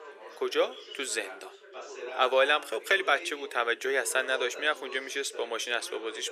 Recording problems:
thin; very; fading below 400 Hz
background chatter; noticeable; throughout; 3 voices, 15 dB below the speech

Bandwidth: 15 kHz